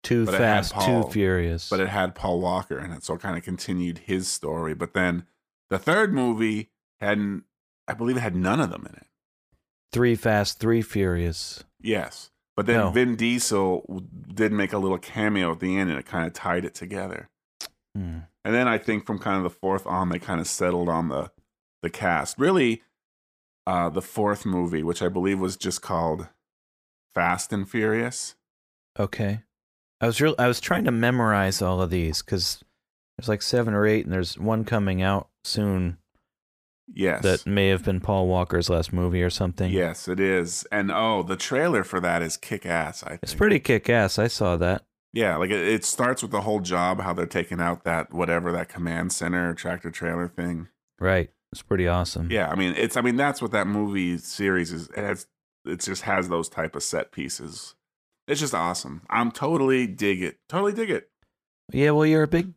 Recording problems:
none

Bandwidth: 15 kHz